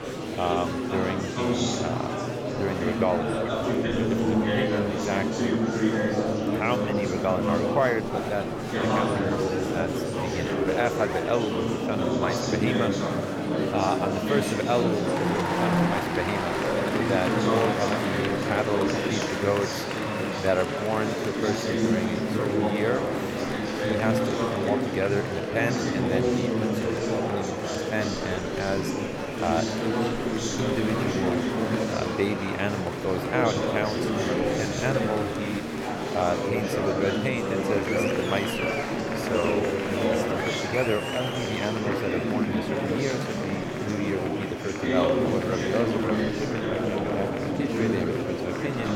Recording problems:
murmuring crowd; very loud; throughout; 4 dB above the speech

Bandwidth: 18.5 kHz